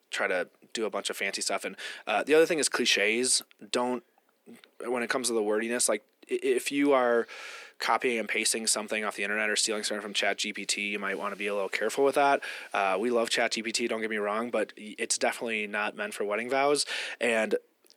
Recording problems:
thin; somewhat; fading below 250 Hz

